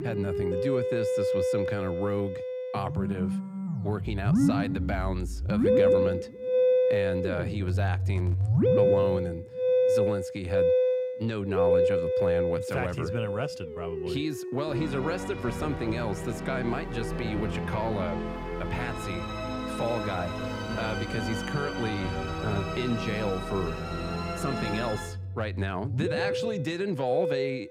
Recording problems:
background music; very loud; throughout; 4 dB above the speech

